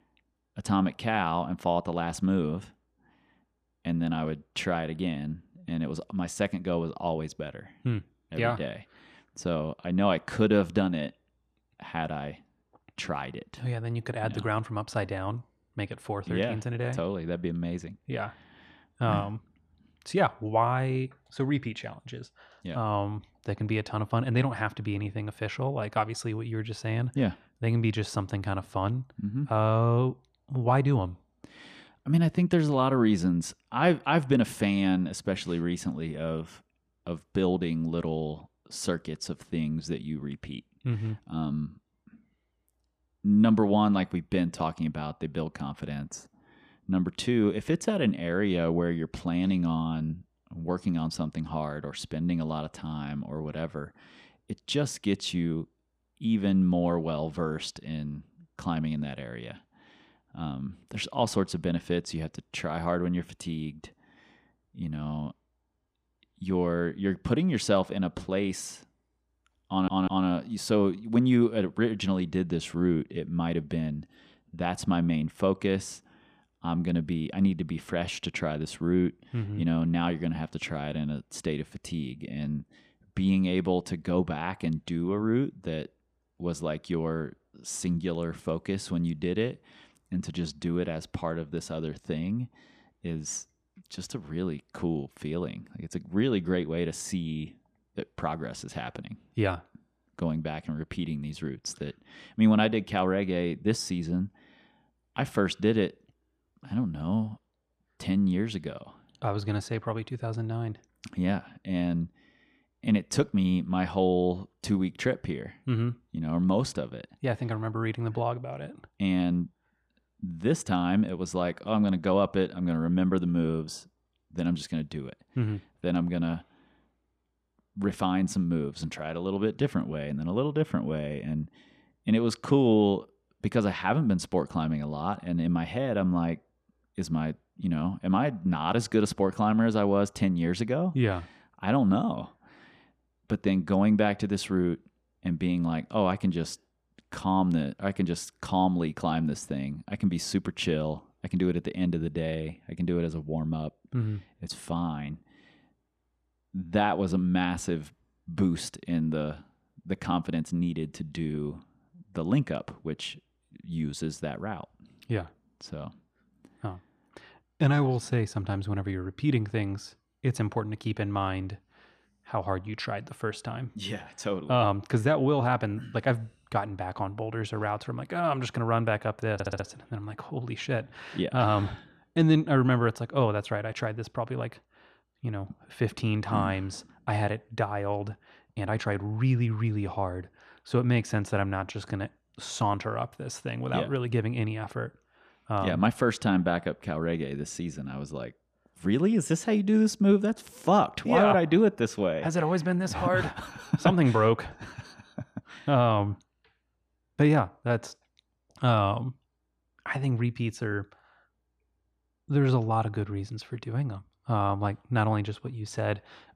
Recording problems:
audio stuttering; at 1:10 and at 2:59

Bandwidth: 14.5 kHz